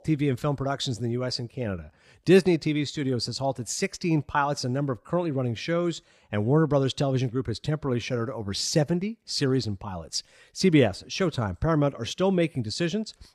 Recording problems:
none

